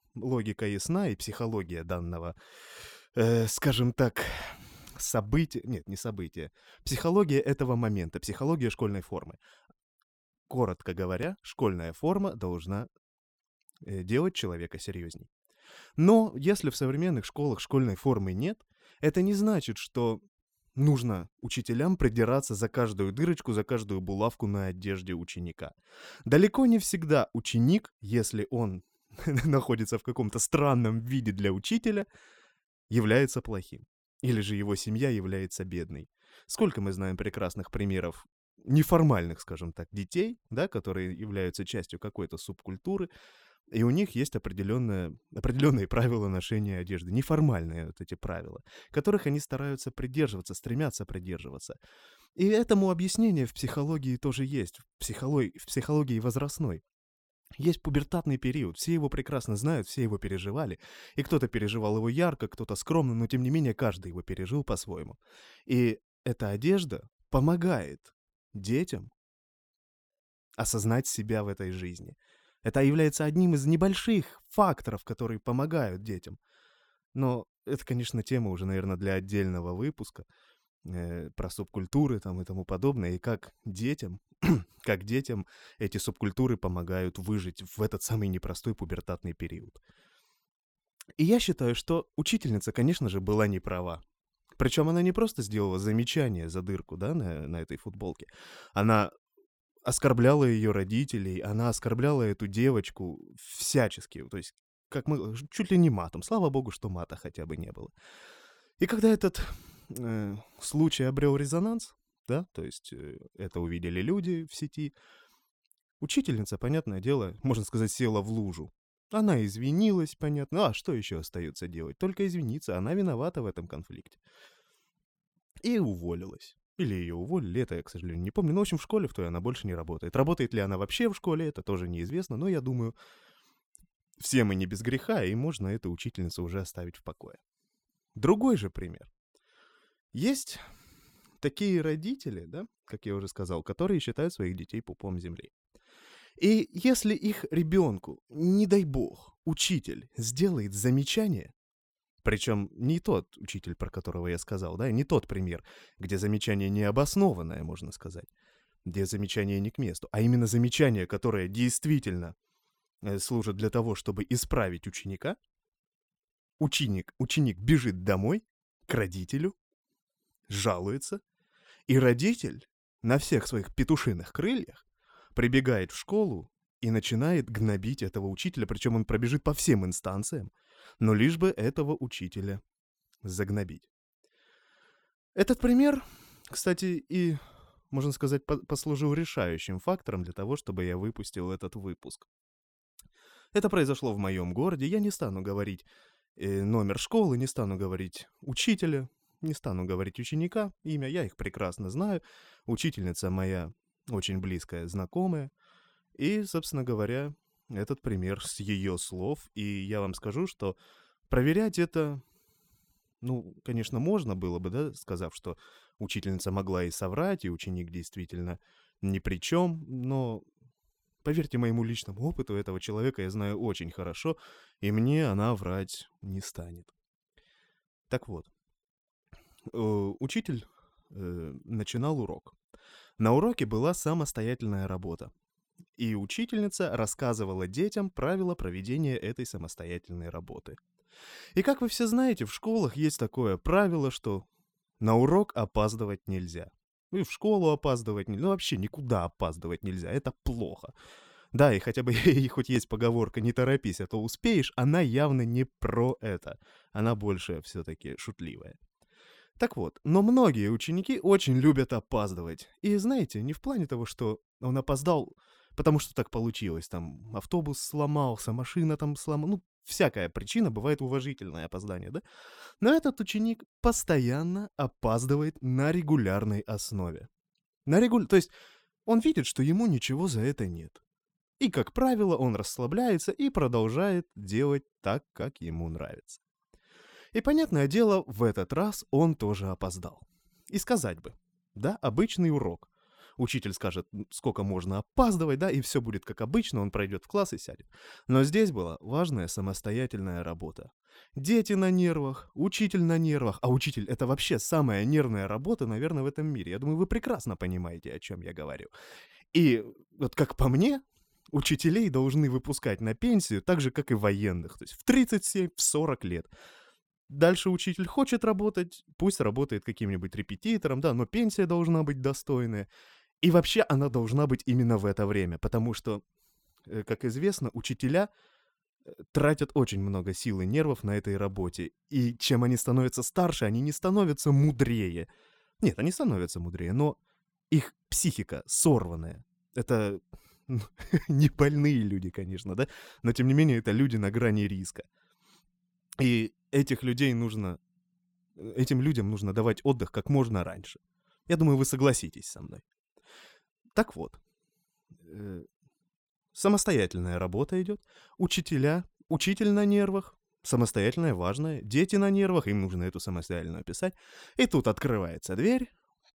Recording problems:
none

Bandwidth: 18.5 kHz